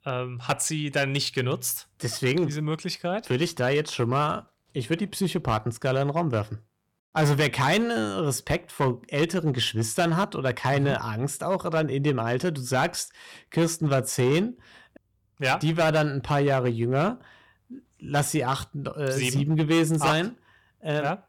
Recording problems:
distortion; slight; 6% of the sound clipped

